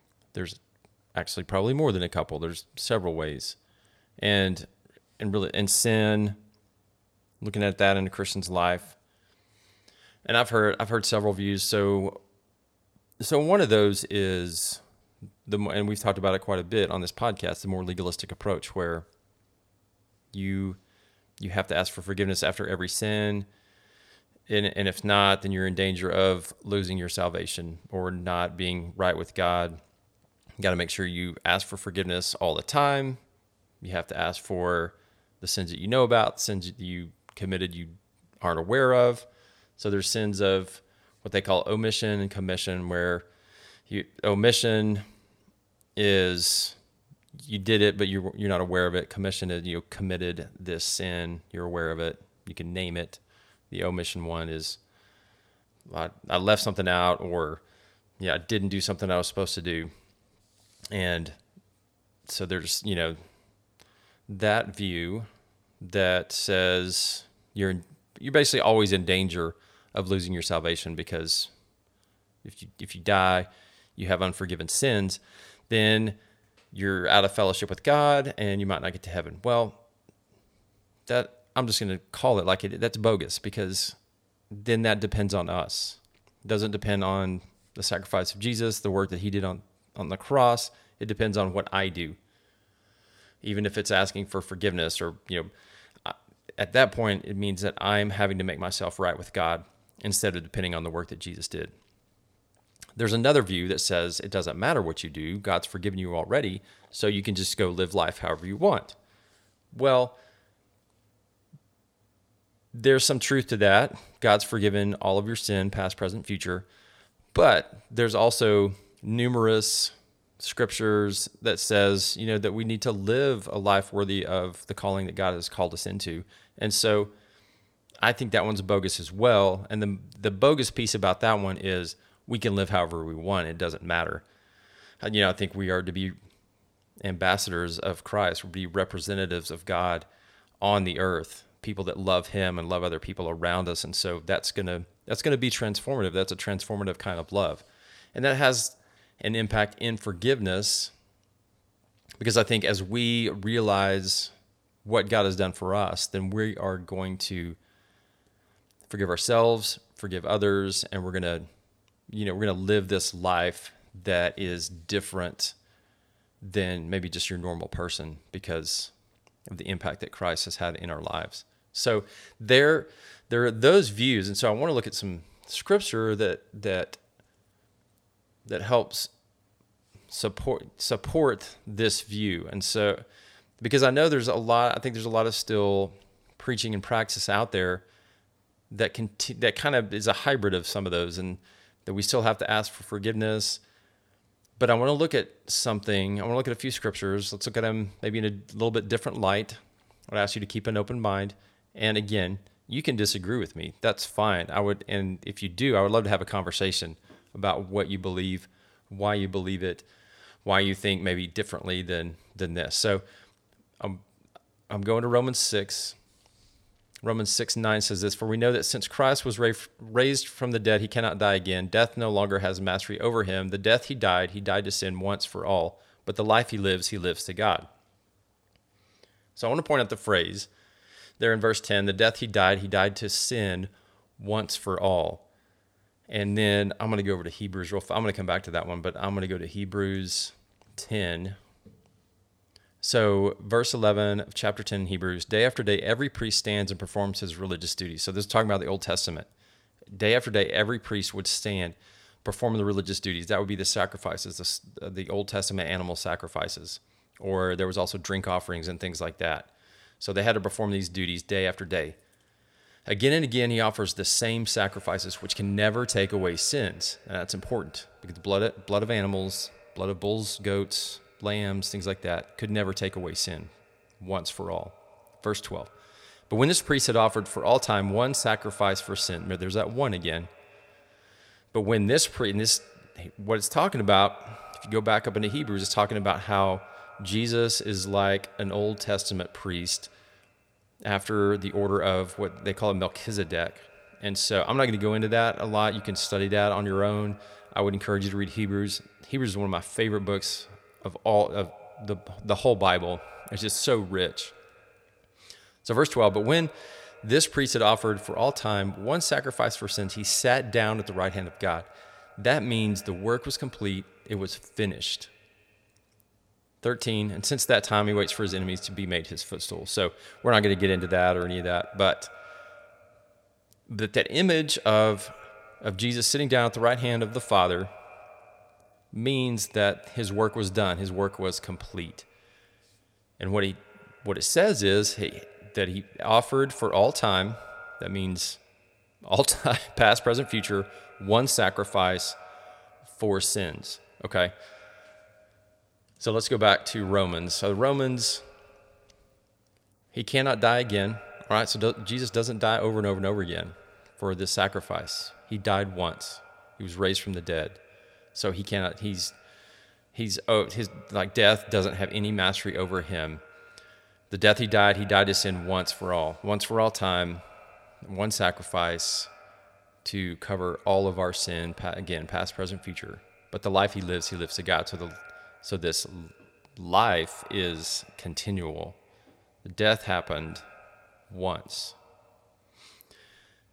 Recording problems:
echo of what is said; faint; from 4:25 on; 100 ms later, 25 dB below the speech

